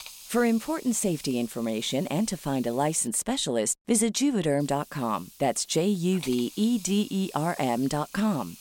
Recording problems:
hiss; noticeable; until 3 s and from 4.5 s on; 20 dB below the speech

